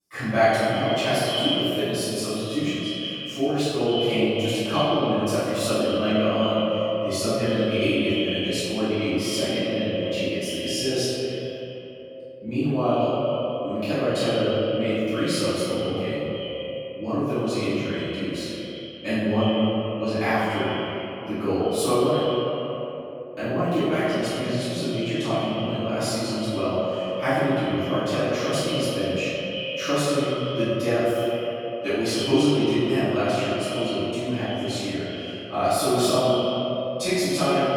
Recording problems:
echo of what is said; strong; throughout; 90 ms later, 7 dB below the speech
room echo; strong; dies away in 2.4 s
off-mic speech; far

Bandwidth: 18 kHz